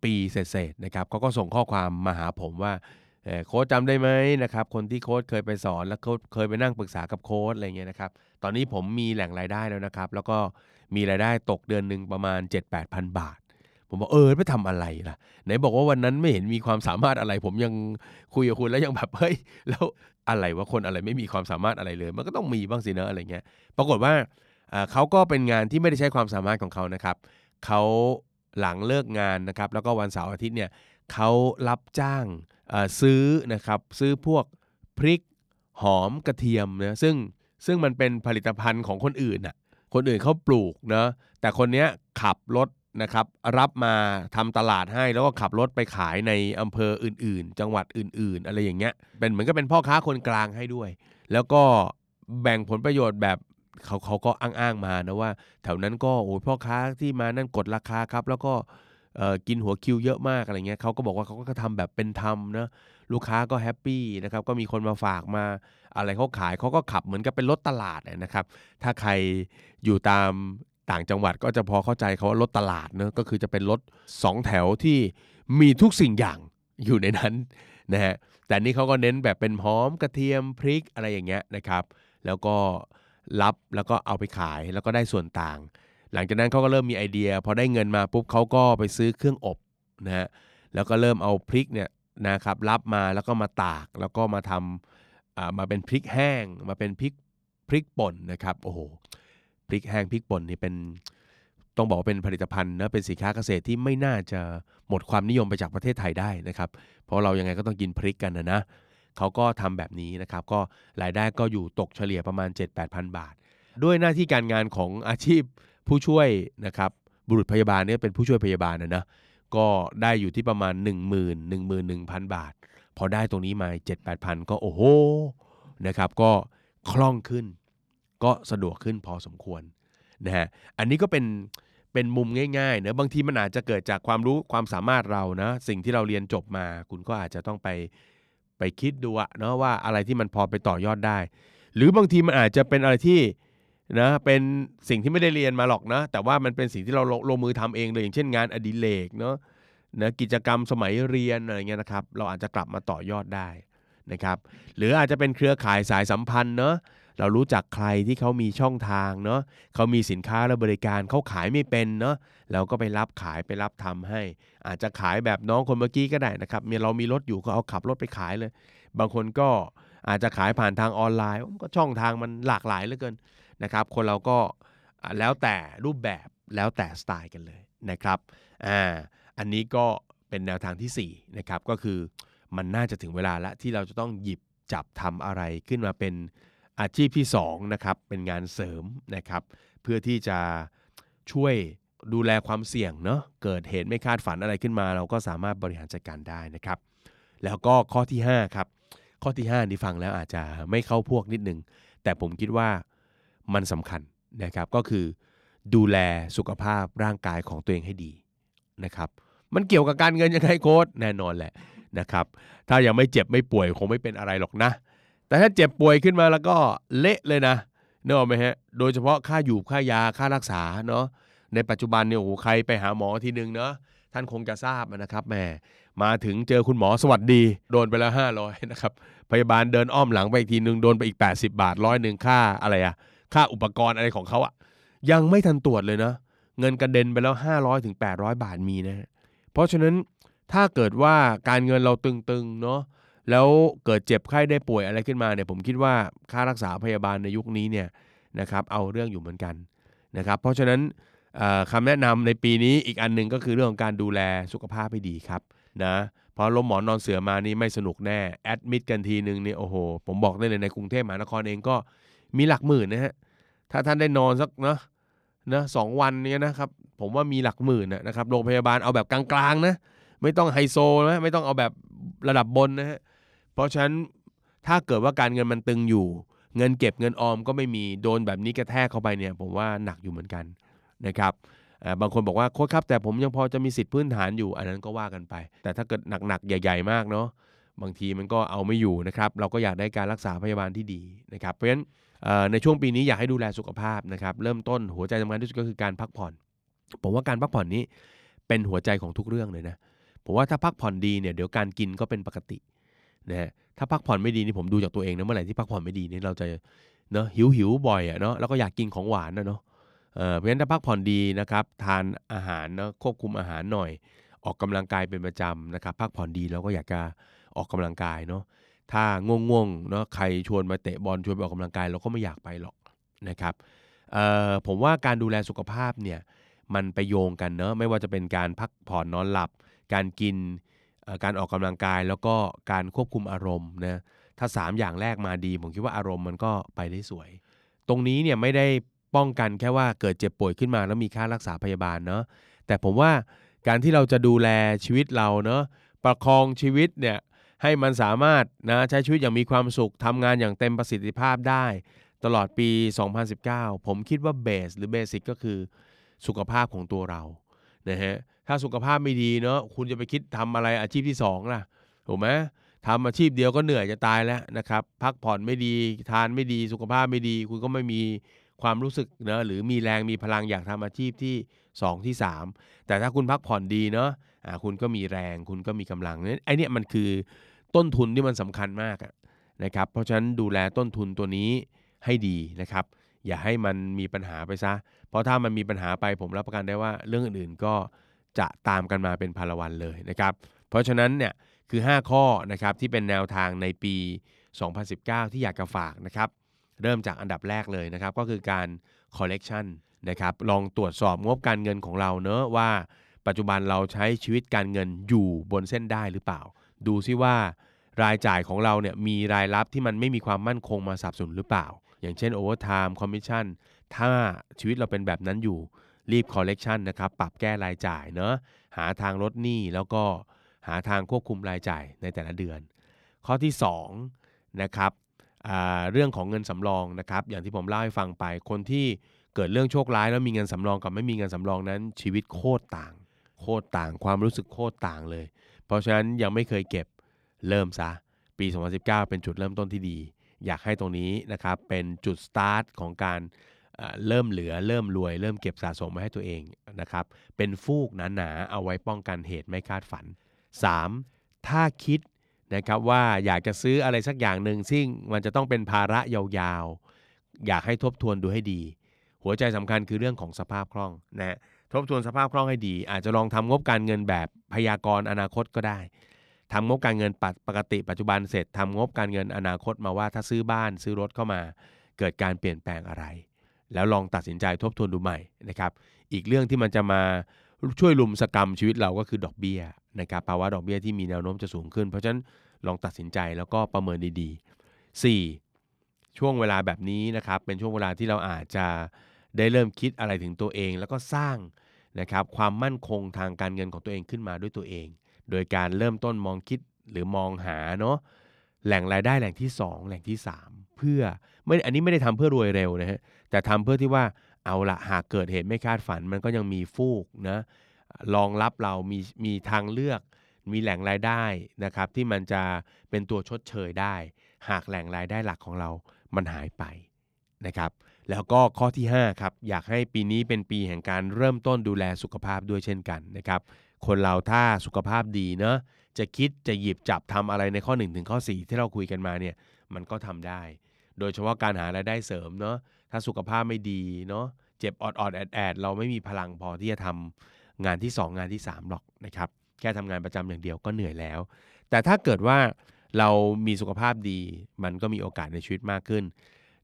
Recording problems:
none

